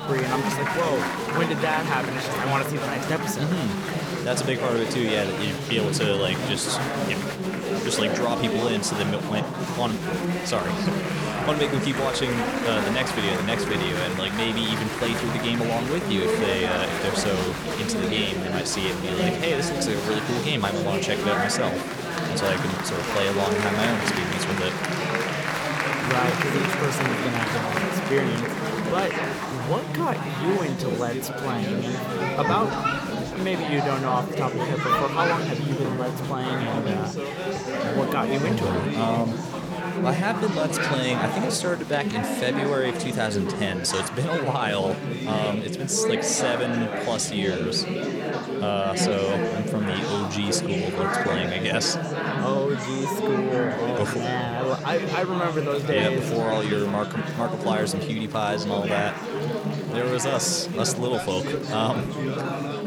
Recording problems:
chatter from many people; loud; throughout; as loud as the speech

